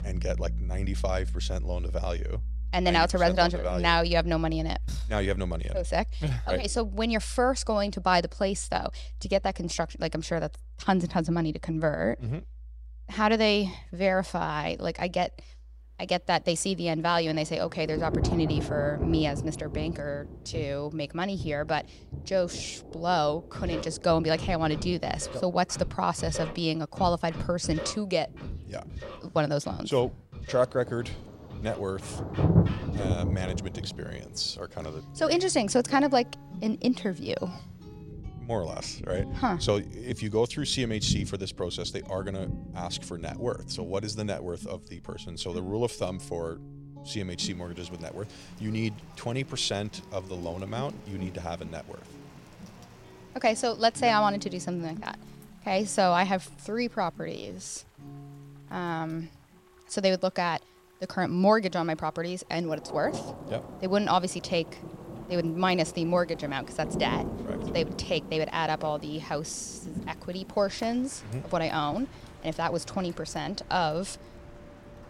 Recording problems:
rain or running water; loud; from 16 s on; 8 dB below the speech
background music; noticeable; throughout; 10 dB below the speech

